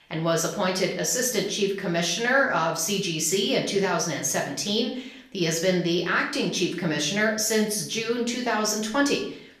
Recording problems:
off-mic speech; far
room echo; slight; dies away in 0.5 s

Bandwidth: 14.5 kHz